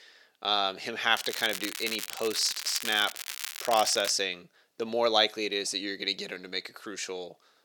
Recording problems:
thin; somewhat; fading below 450 Hz
crackling; loud; from 1 to 4 s; 7 dB below the speech

